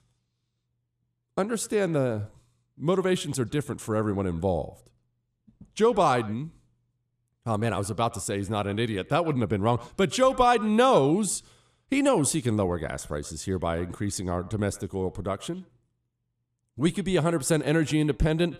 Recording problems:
echo of what is said; faint; throughout; 120 ms later, 20 dB below the speech

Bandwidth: 14.5 kHz